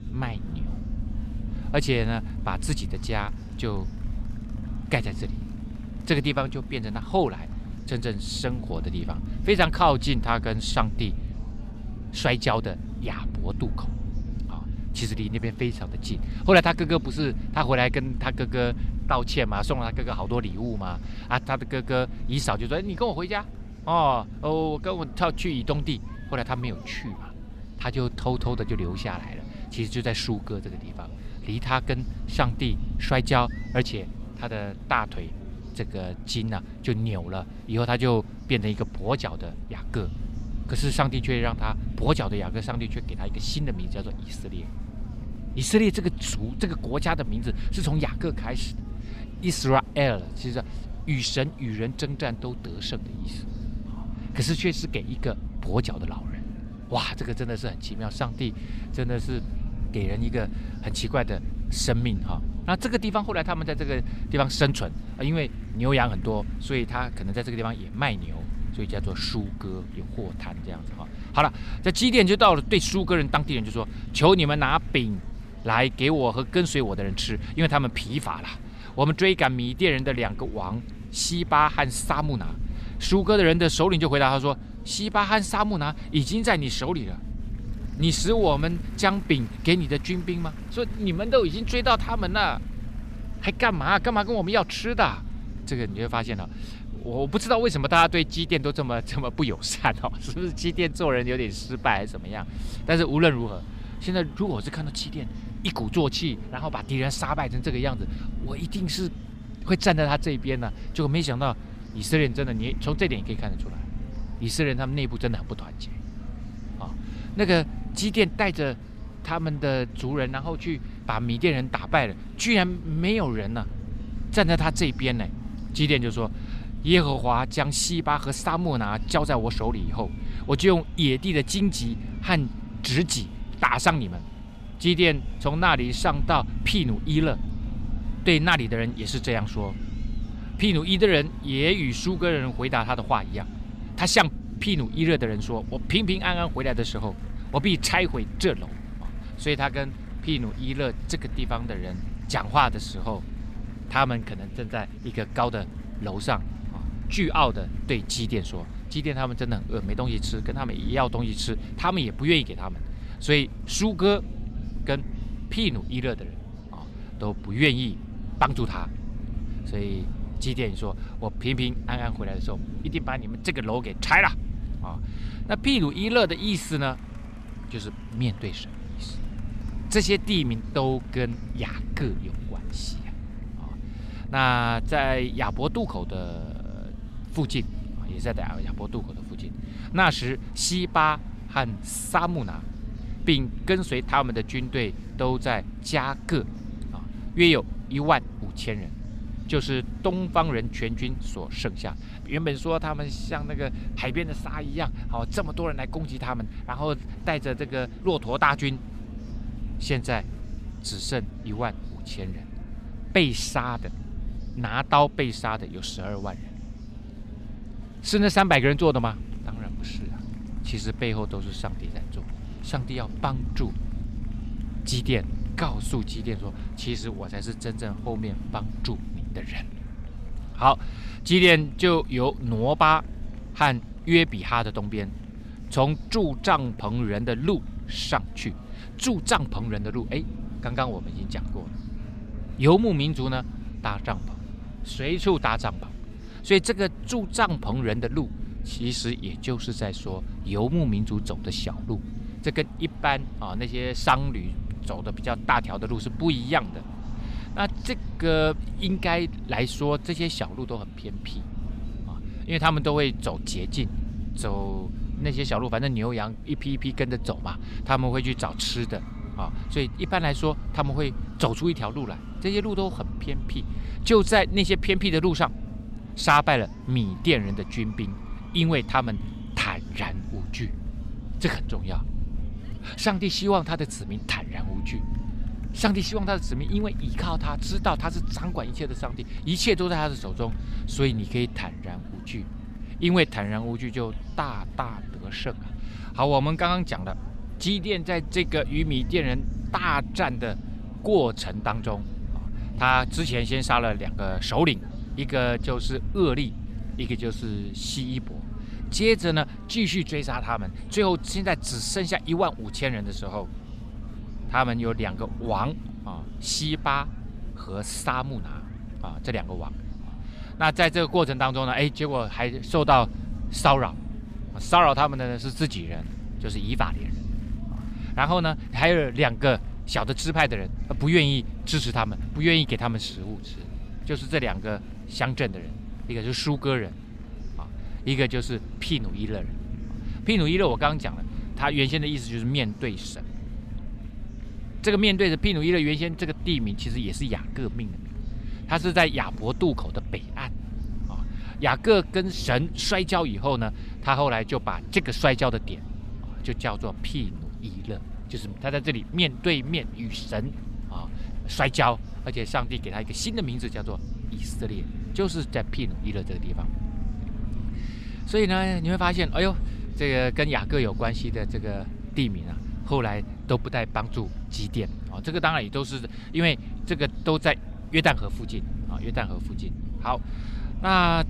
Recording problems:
murmuring crowd; faint; throughout; 25 dB below the speech
low rumble; faint; throughout; 20 dB below the speech

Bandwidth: 14.5 kHz